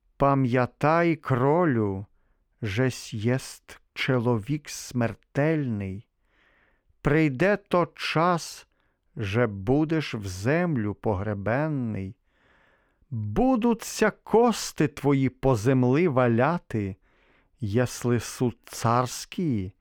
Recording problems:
muffled; slightly; fading above 3.5 kHz

